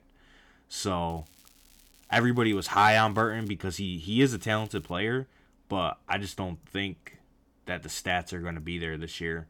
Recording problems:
crackling; faint; from 1 to 3.5 s and at 4.5 s; 30 dB below the speech

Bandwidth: 18.5 kHz